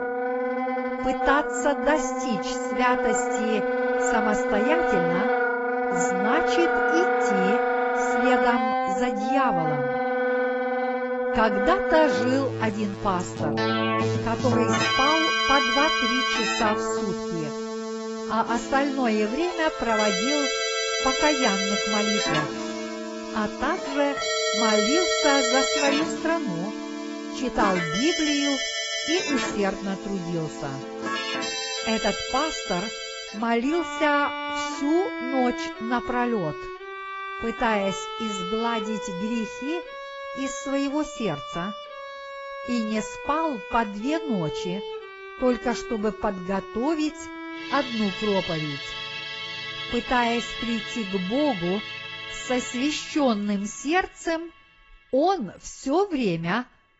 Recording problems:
garbled, watery; badly; nothing above 7.5 kHz
background music; loud; throughout; as loud as the speech

